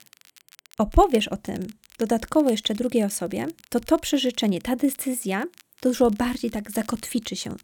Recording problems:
crackle, like an old record; faint; 25 dB below the speech

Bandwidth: 18.5 kHz